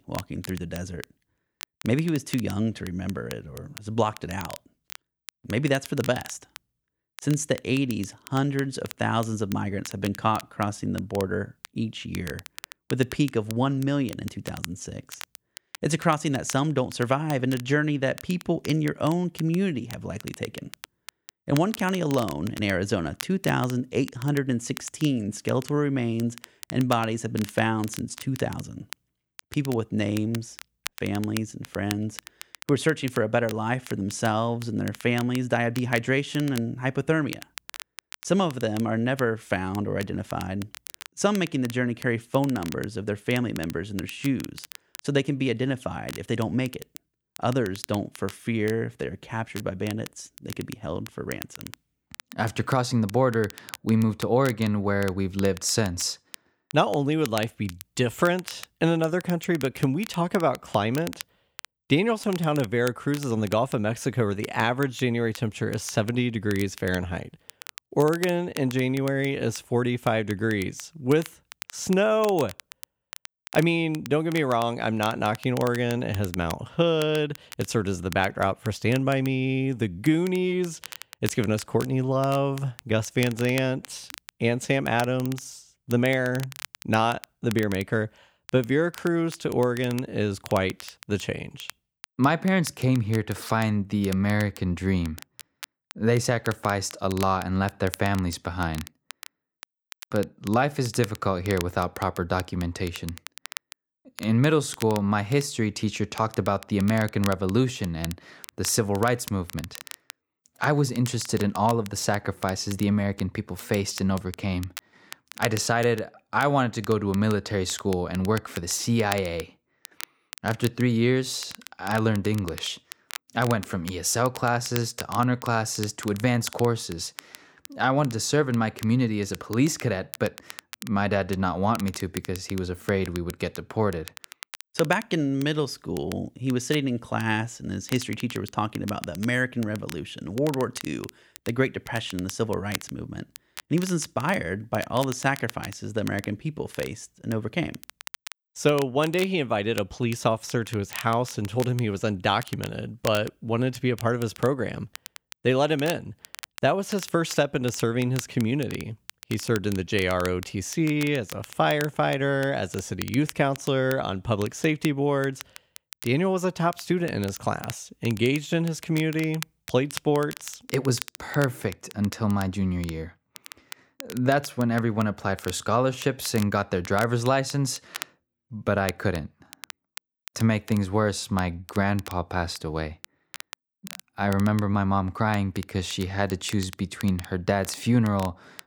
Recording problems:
crackle, like an old record; noticeable; 15 dB below the speech

